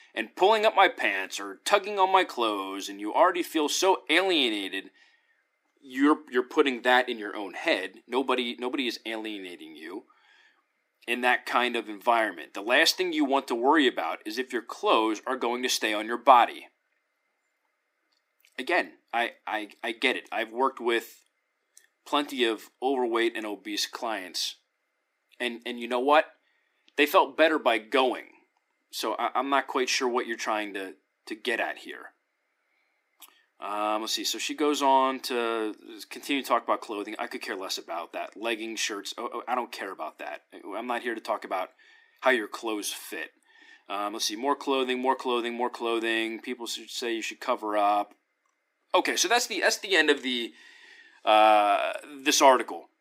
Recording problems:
thin; very slightly; fading below 300 Hz

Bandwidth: 15.5 kHz